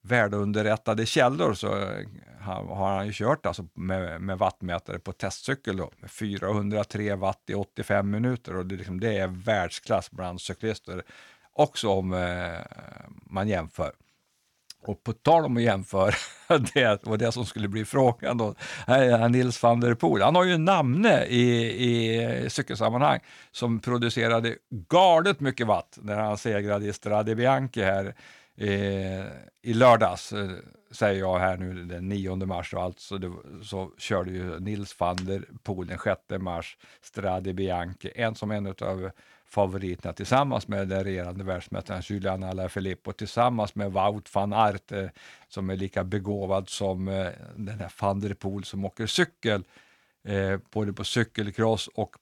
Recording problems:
none

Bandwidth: 18 kHz